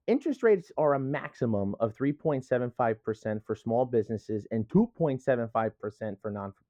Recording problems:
muffled; very; fading above 2 kHz

